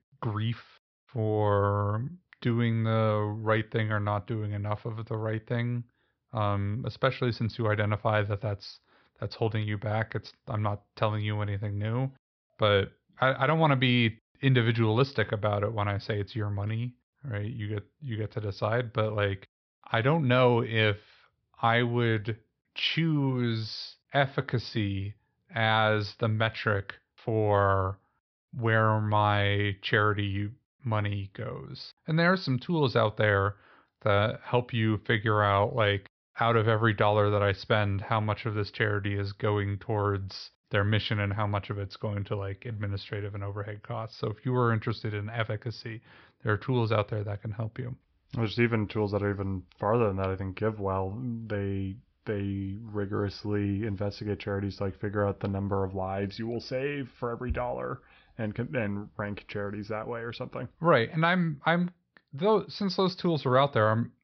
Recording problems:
high frequencies cut off; noticeable; nothing above 5.5 kHz

